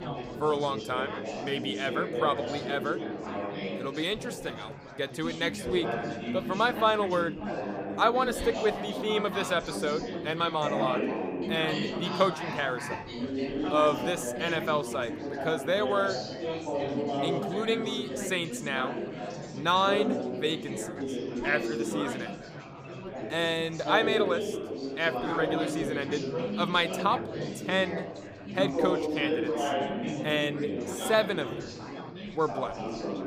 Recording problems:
chatter from many people; loud; throughout; 4 dB below the speech

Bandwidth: 15.5 kHz